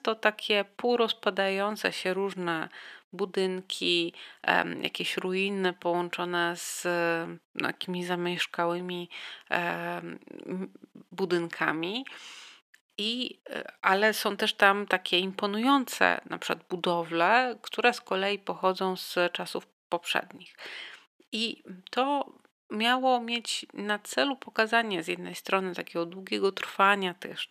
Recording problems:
thin; somewhat; fading below 300 Hz

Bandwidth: 14.5 kHz